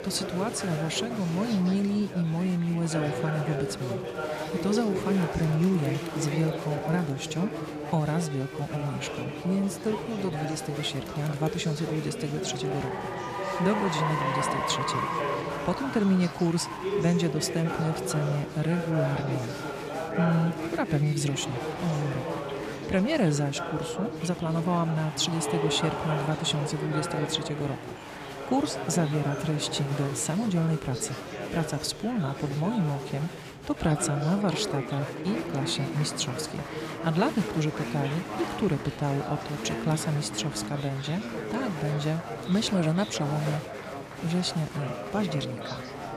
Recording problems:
chatter from many people; loud; throughout; 5 dB below the speech

